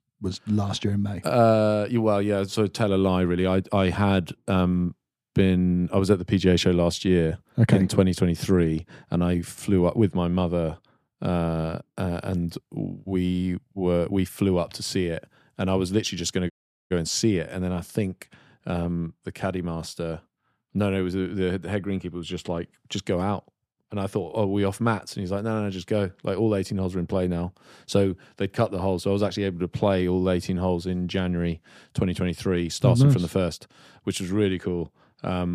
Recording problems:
audio cutting out; at 17 s
abrupt cut into speech; at the end

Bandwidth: 15 kHz